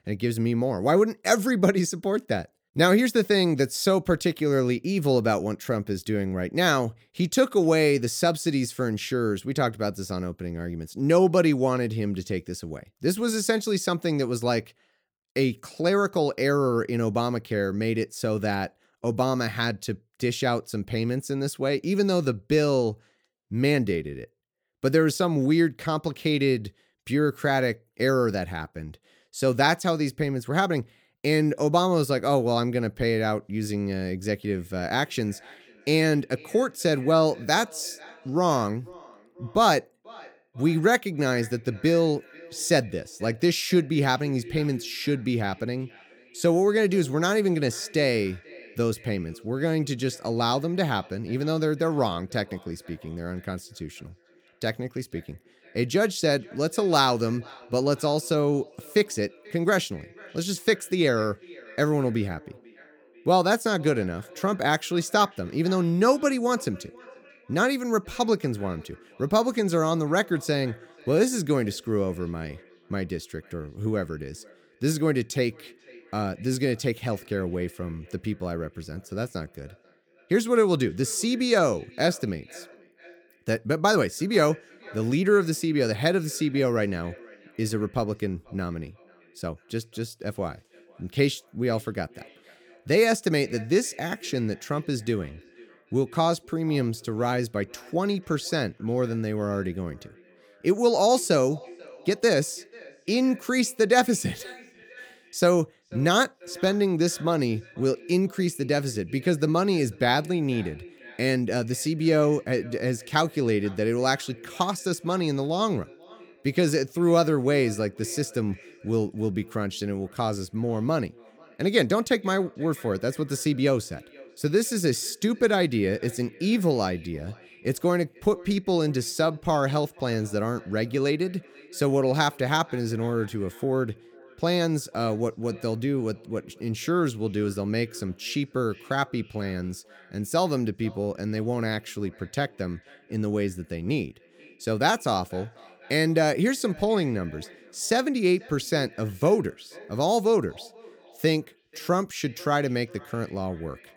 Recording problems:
echo of what is said; faint; from 34 s on; 490 ms later, 25 dB below the speech

